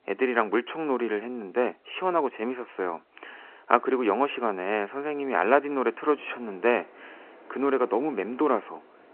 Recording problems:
phone-call audio
wind in the background; faint; throughout; 25 dB below the speech

